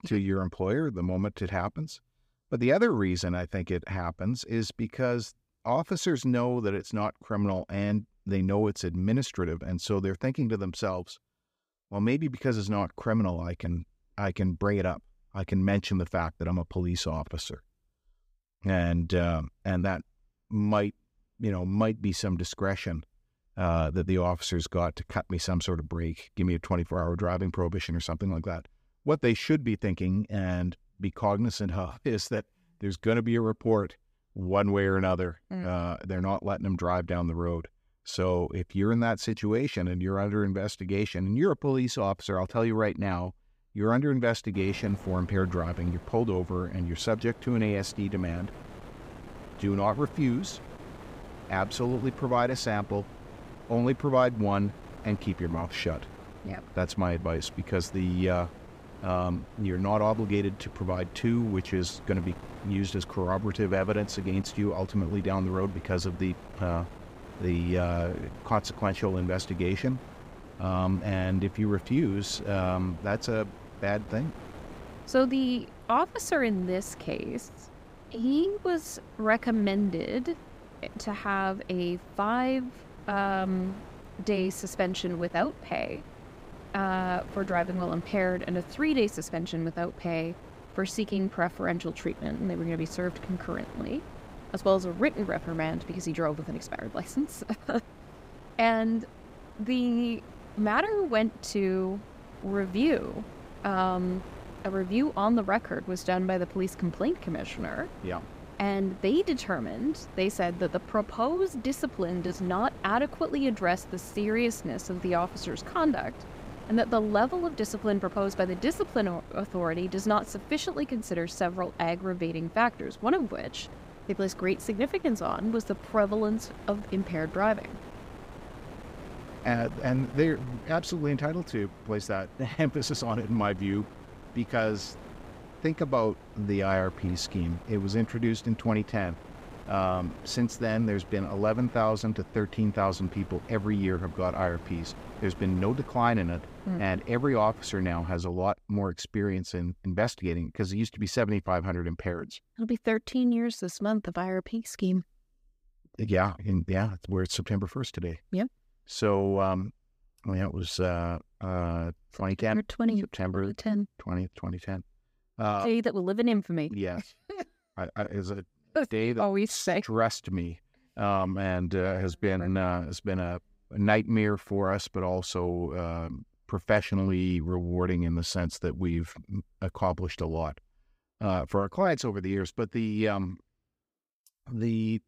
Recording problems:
wind noise on the microphone; occasional gusts; from 45 s to 2:28; 15 dB below the speech

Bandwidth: 15.5 kHz